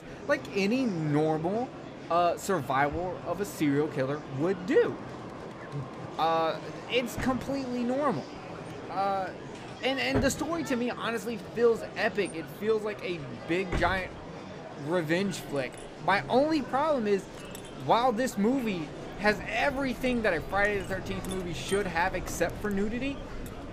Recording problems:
household noises; noticeable; throughout; 15 dB below the speech
train or aircraft noise; noticeable; throughout; 15 dB below the speech
murmuring crowd; noticeable; throughout; 15 dB below the speech

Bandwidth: 15 kHz